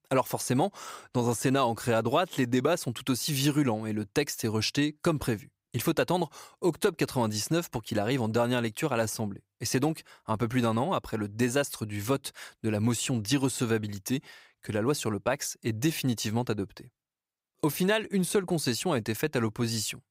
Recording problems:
none

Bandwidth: 15.5 kHz